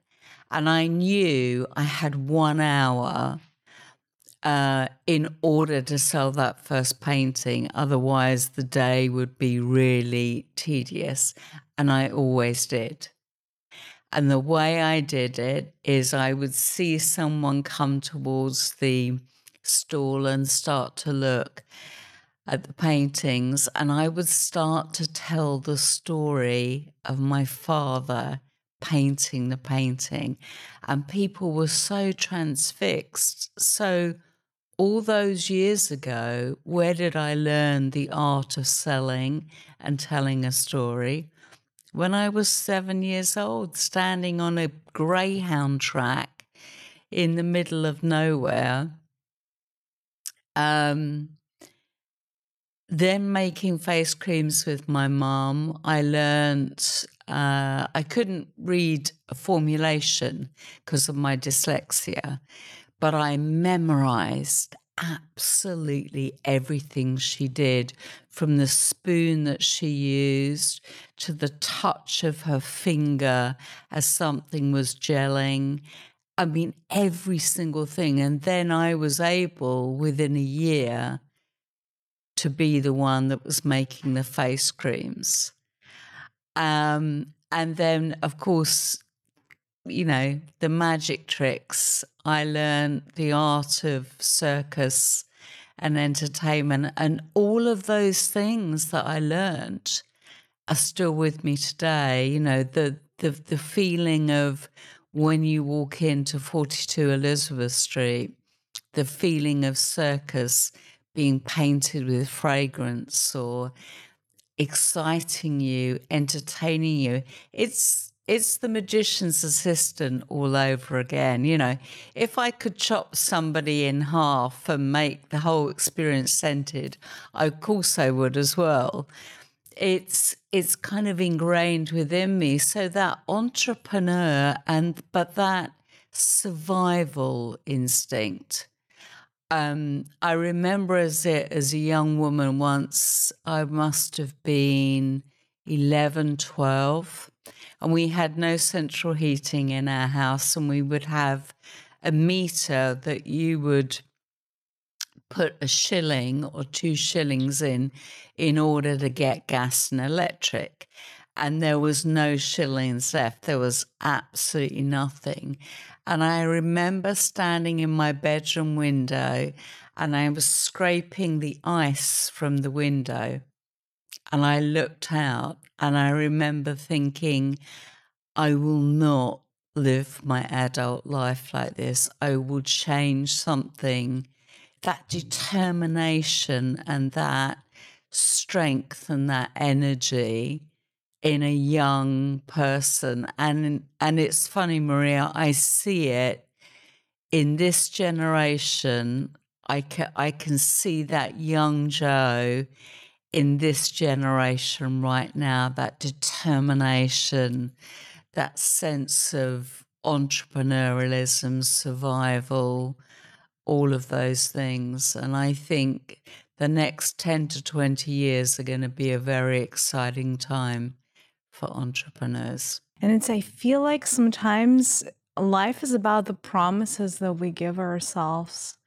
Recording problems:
wrong speed, natural pitch; too slow; 0.7 times normal speed

